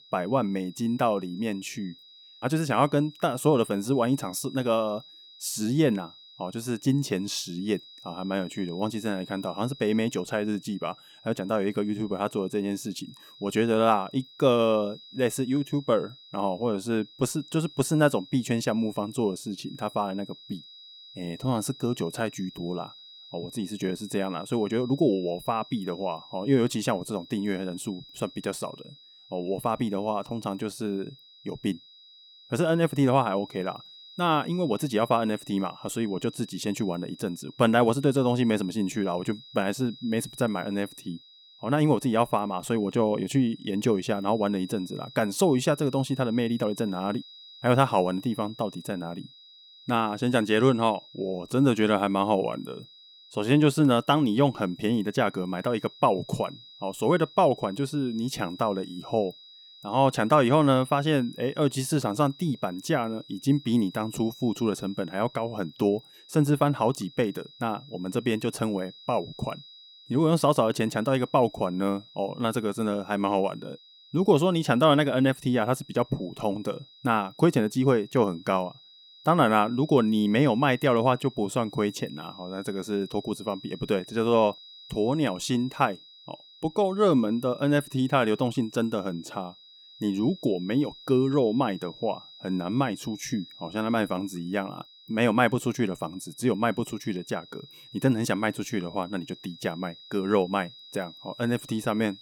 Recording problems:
high-pitched whine; faint; throughout; 4 kHz, 20 dB below the speech

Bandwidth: 18.5 kHz